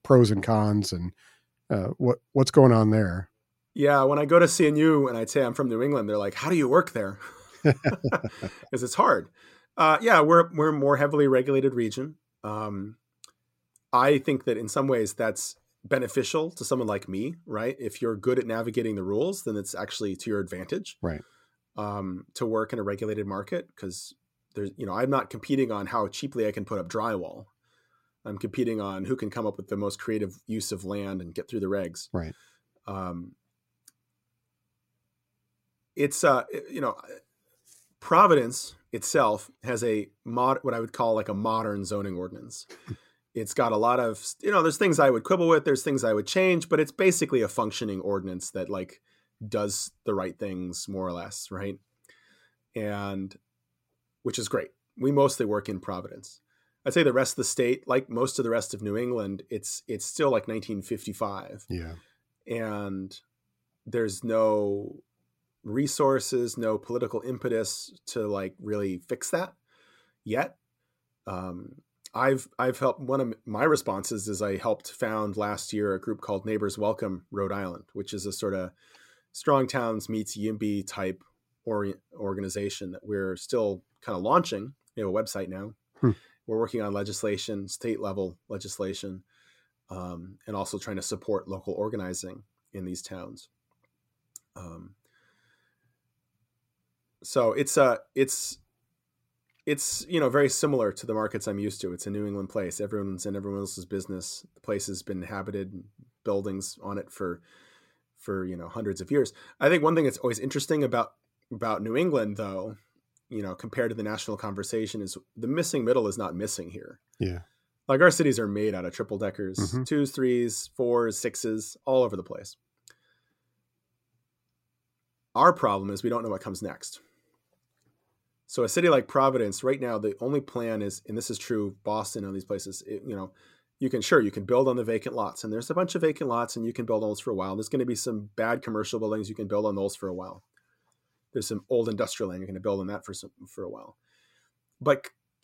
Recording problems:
none

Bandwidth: 16 kHz